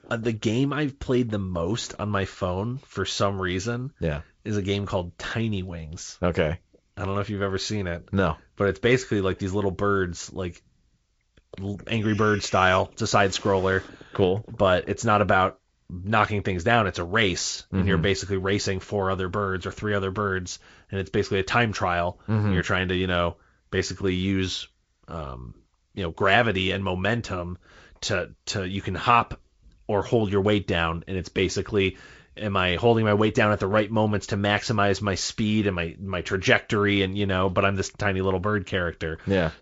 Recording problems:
garbled, watery; slightly; nothing above 7.5 kHz

